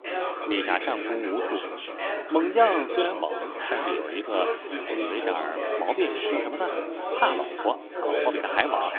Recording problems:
echo of what is said; noticeable; throughout; 360 ms later, 15 dB below the speech
phone-call audio; nothing above 3.5 kHz
chatter from many people; loud; throughout; 3 dB below the speech
traffic noise; very faint; throughout; 30 dB below the speech

